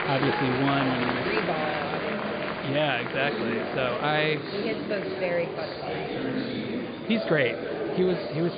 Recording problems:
high frequencies cut off; severe; nothing above 5 kHz
murmuring crowd; loud; throughout; 2 dB below the speech
abrupt cut into speech; at the end

